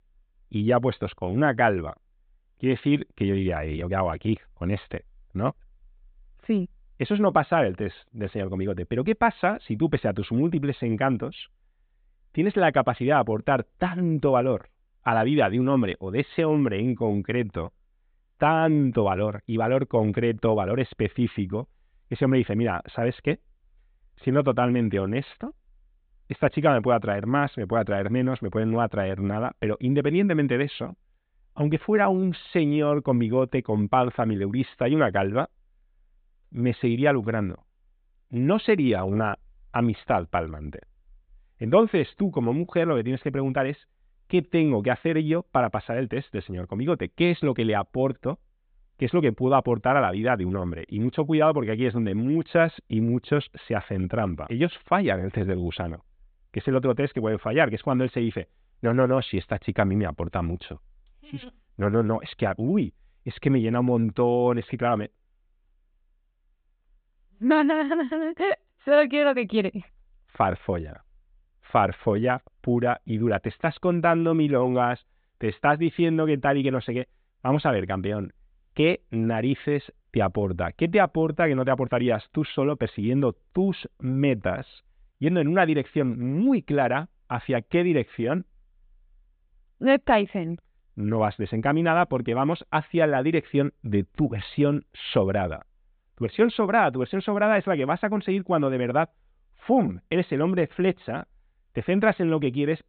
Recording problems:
high frequencies cut off; severe; nothing above 4 kHz

